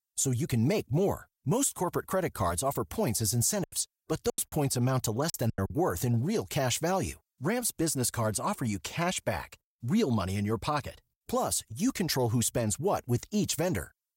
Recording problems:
choppy; very; from 3.5 to 5.5 s; 17% of the speech affected

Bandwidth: 16 kHz